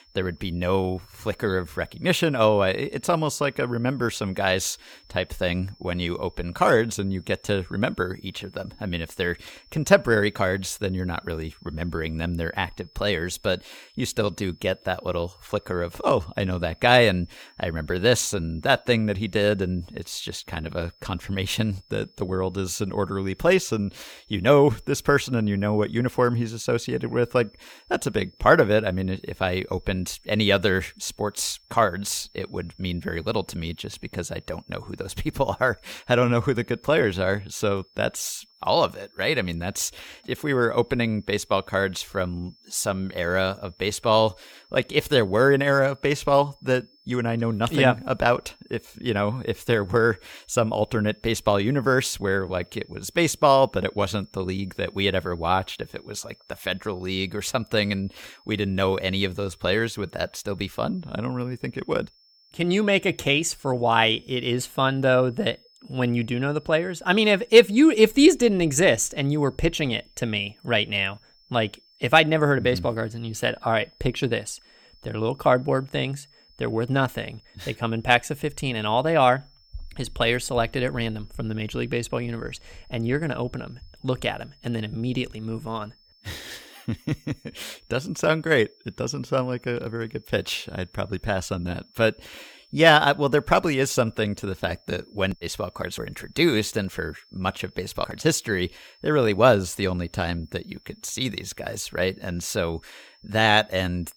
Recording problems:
high-pitched whine; faint; throughout; 5.5 kHz, 30 dB below the speech

